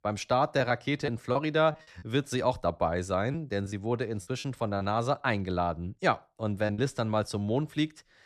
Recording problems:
choppy; very; from 0.5 to 3.5 s and from 4.5 to 7 s; 6% of the speech affected

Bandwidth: 13.5 kHz